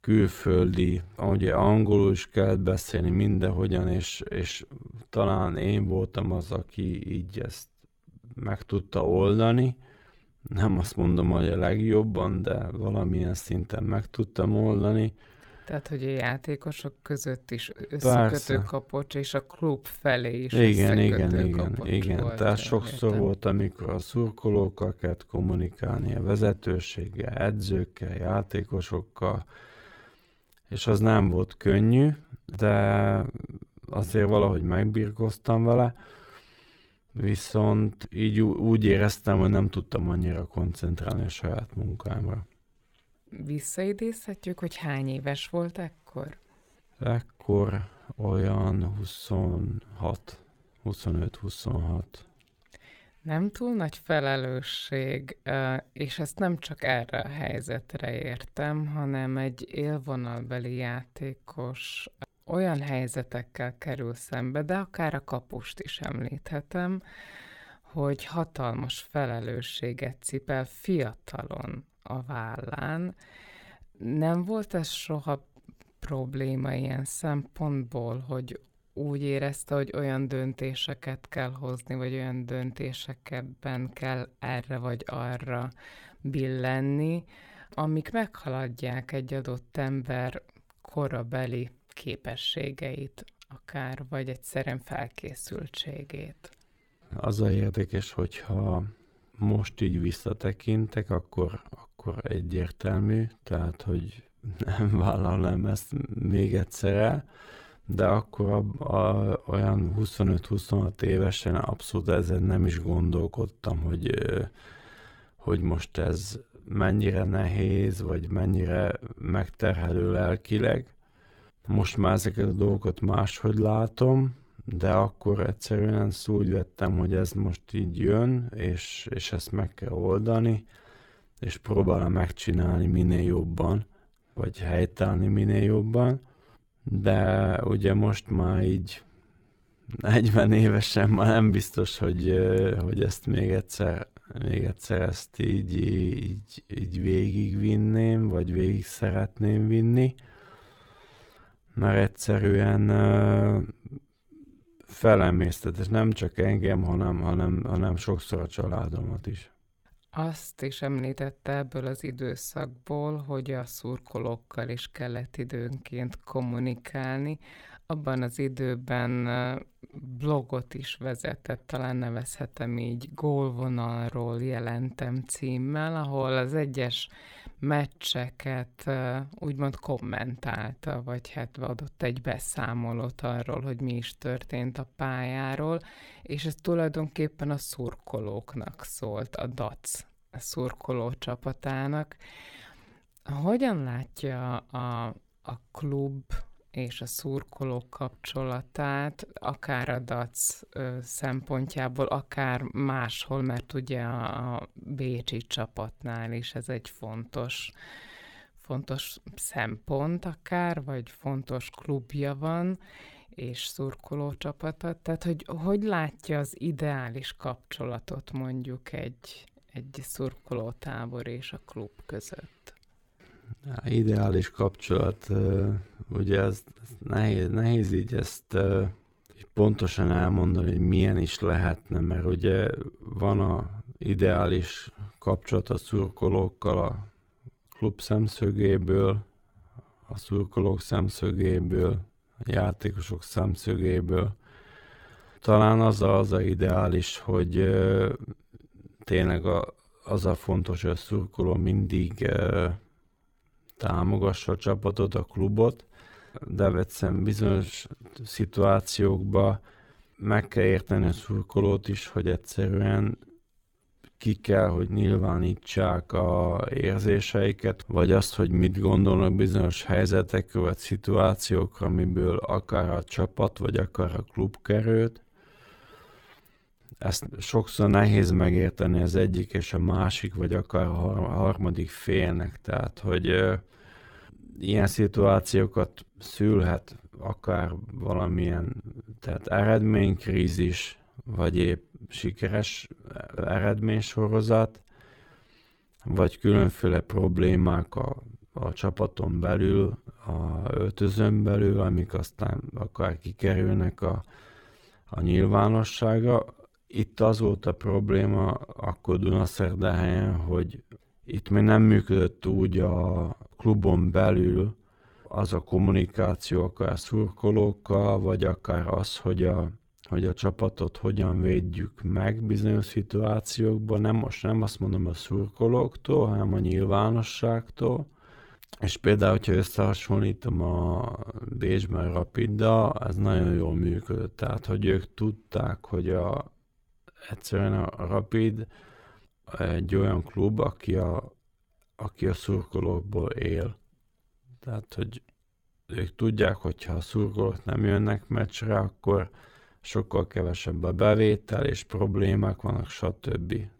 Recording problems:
wrong speed, natural pitch; too slow; 0.7 times normal speed

